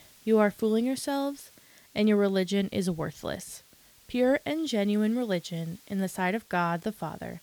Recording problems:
hiss; faint; throughout; 25 dB below the speech

